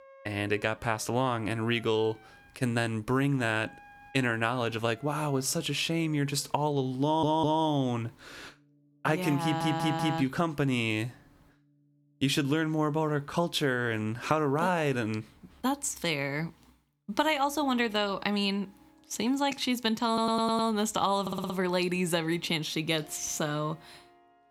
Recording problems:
background music; faint; throughout; 30 dB below the speech
audio stuttering; 4 times, first at 7 s

